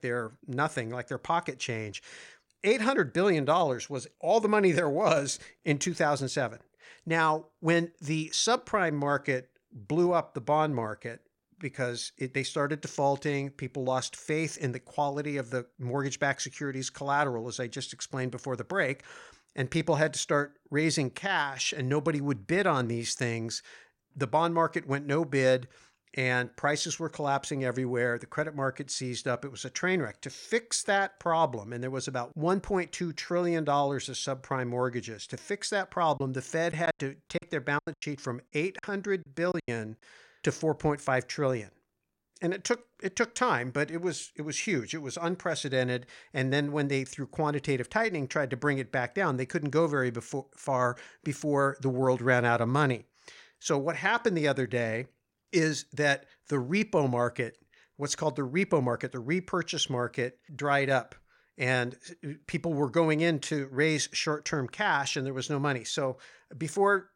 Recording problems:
choppy; very; from 36 to 40 s; 14% of the speech affected

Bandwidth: 16.5 kHz